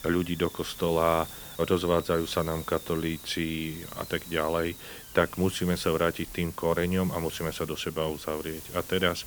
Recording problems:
hiss; noticeable; throughout; 15 dB below the speech

